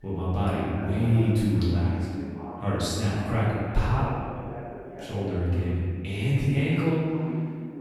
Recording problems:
room echo; strong; dies away in 1.9 s
off-mic speech; far
voice in the background; noticeable; throughout; 15 dB below the speech

